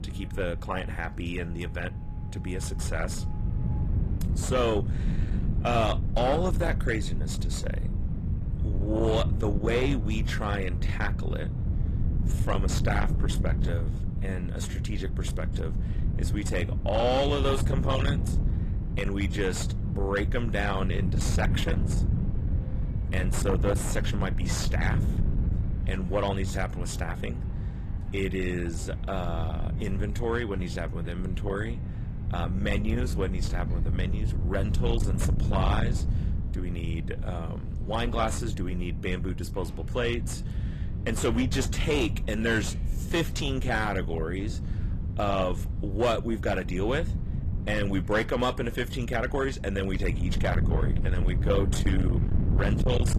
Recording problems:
distortion; slight; 10 dB below the speech
garbled, watery; slightly; nothing above 14.5 kHz
wind noise on the microphone; occasional gusts; 10 dB below the speech
traffic noise; faint; throughout; 20 dB below the speech

